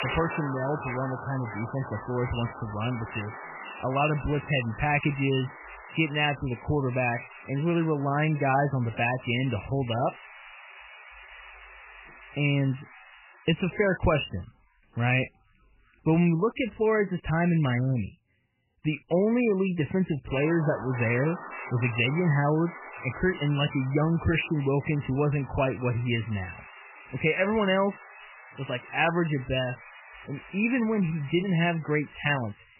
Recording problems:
garbled, watery; badly; nothing above 3 kHz
hiss; noticeable; until 16 s and from 20 s on; 15 dB below the speech

